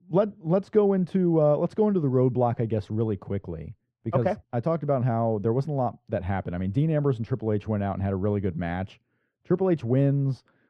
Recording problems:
muffled; very; fading above 2.5 kHz

